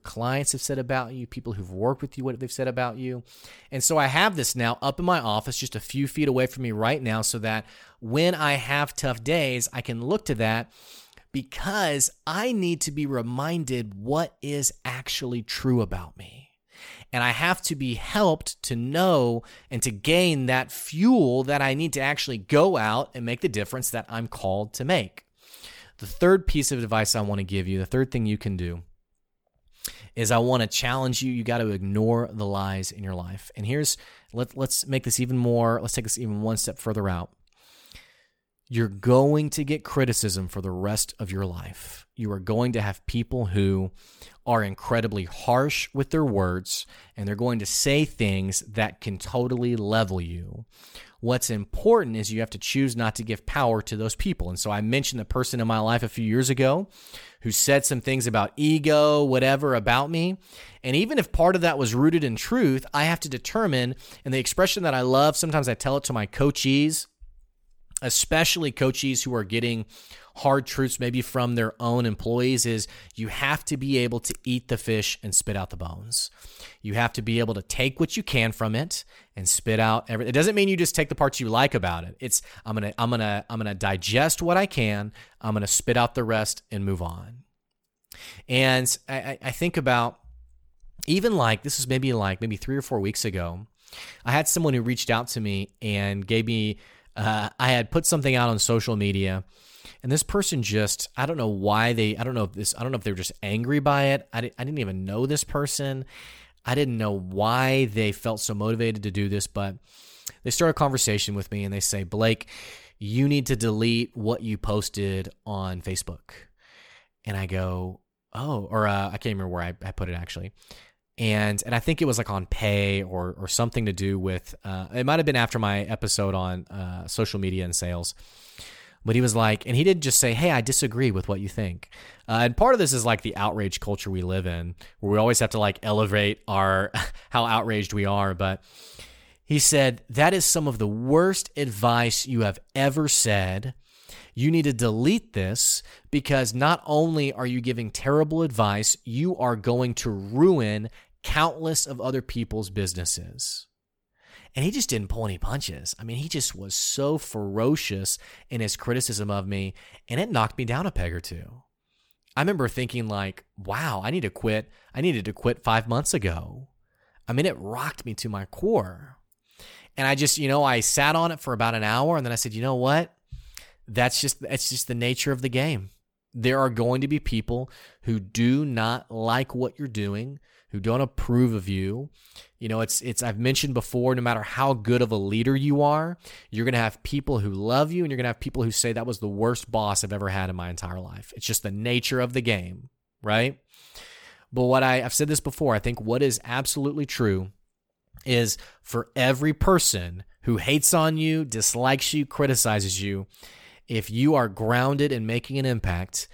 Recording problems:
none

